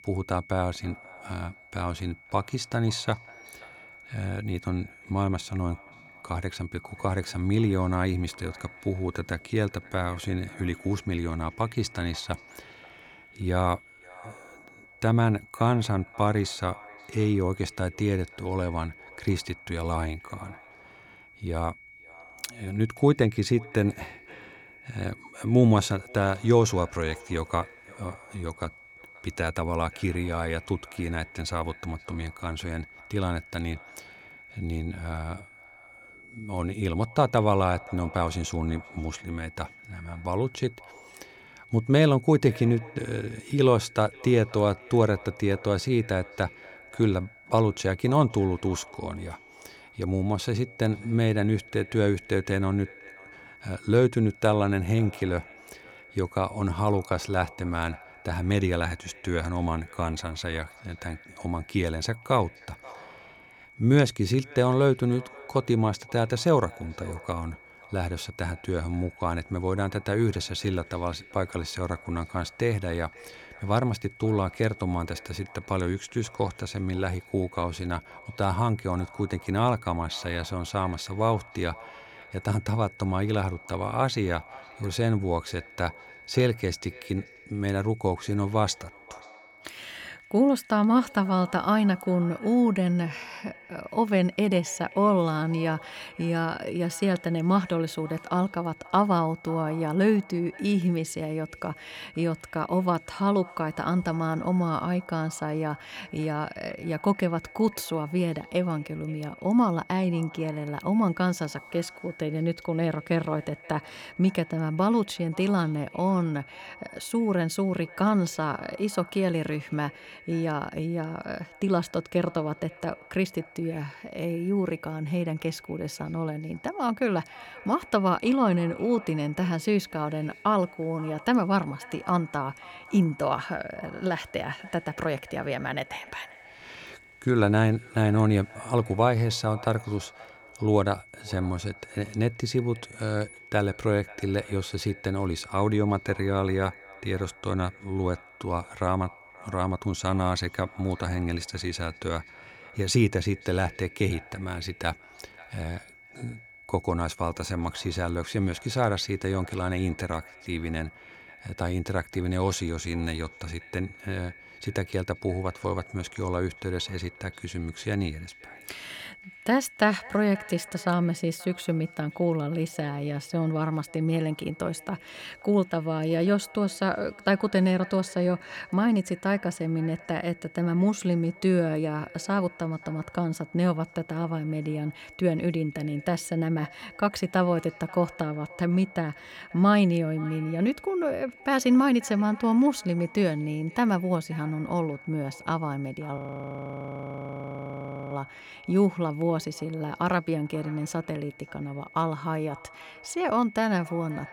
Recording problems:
echo of what is said; faint; throughout; 530 ms later, 25 dB below the speech
high-pitched whine; faint; throughout; 2 kHz, 20 dB below the speech
audio freezing; at 3:16 for 2 s

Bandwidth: 18 kHz